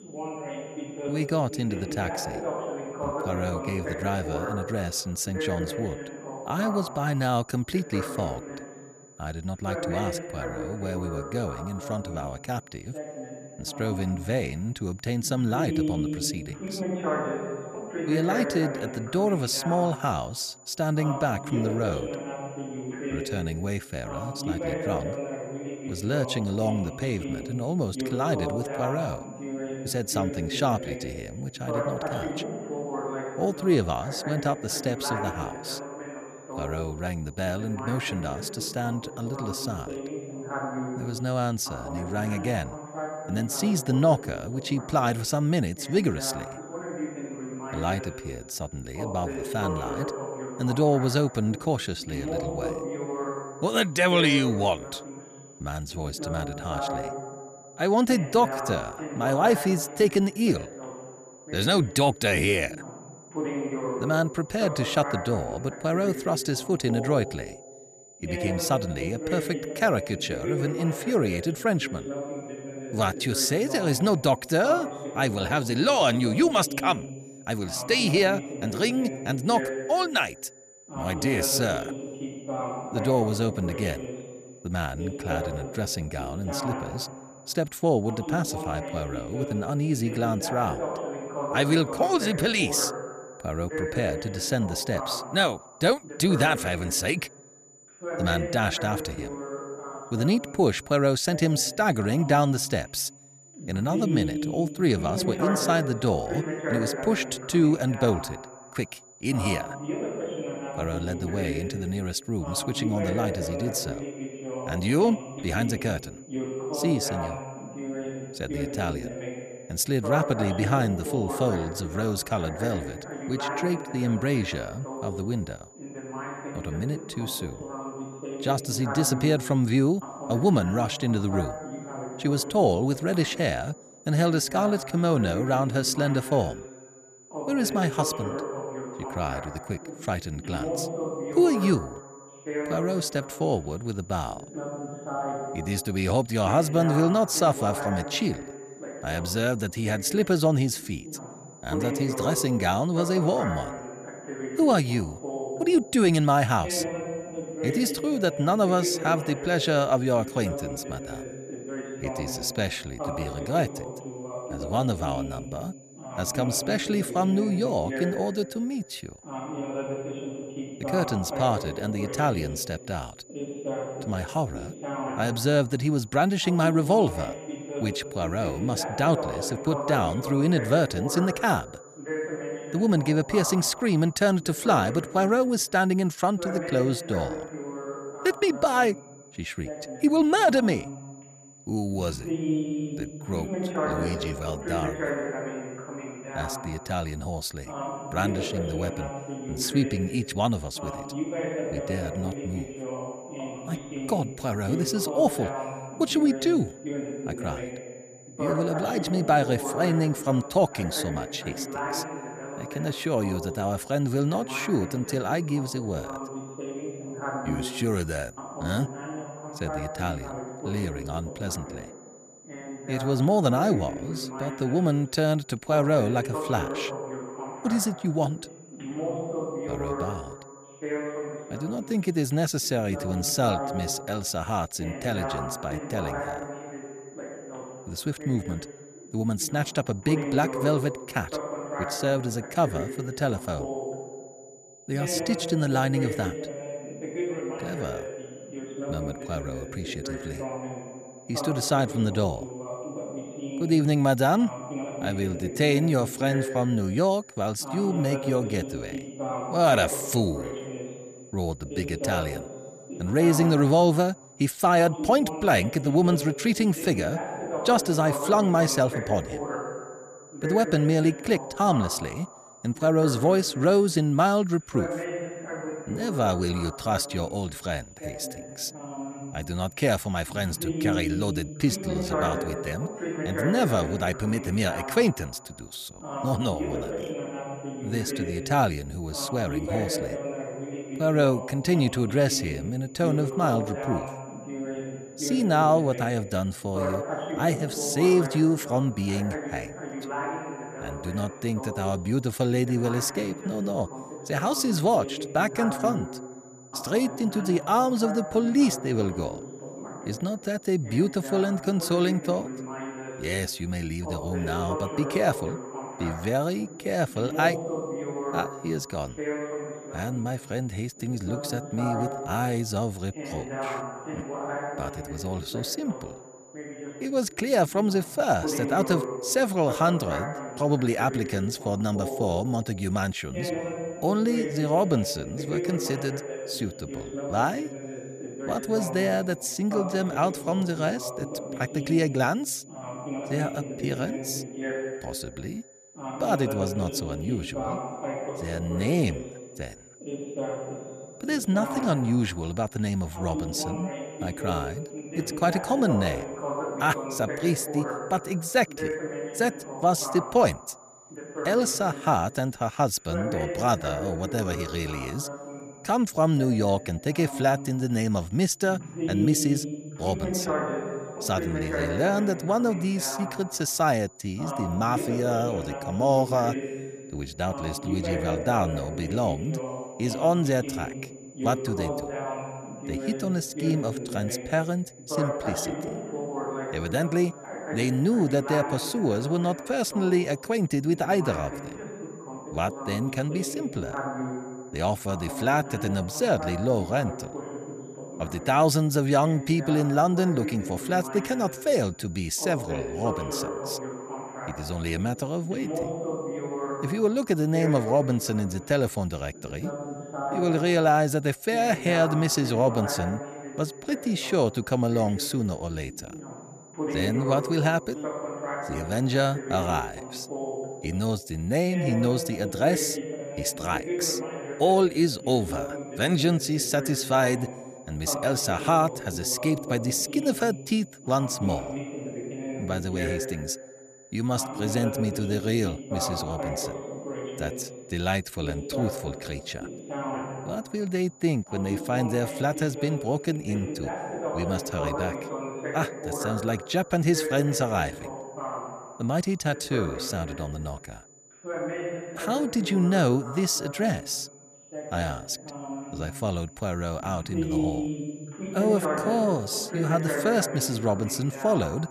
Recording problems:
voice in the background; loud; throughout; 8 dB below the speech
high-pitched whine; faint; throughout; 7 kHz, 25 dB below the speech

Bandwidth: 14.5 kHz